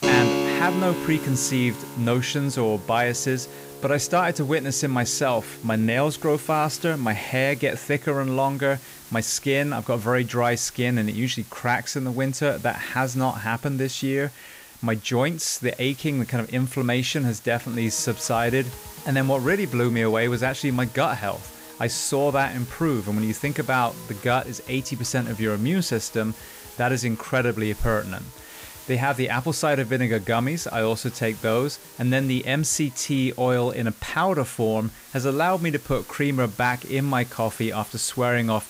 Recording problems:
background music; noticeable; throughout; 10 dB below the speech
hiss; noticeable; throughout; 20 dB below the speech

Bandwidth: 15.5 kHz